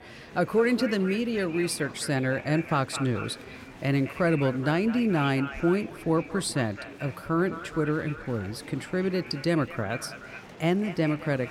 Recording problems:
echo of what is said; noticeable; throughout; 210 ms later, 15 dB below the speech
murmuring crowd; noticeable; throughout; 20 dB below the speech

